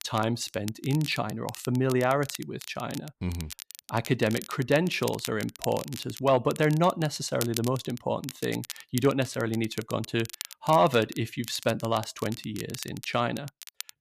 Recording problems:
crackle, like an old record; noticeable; 15 dB below the speech

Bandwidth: 14.5 kHz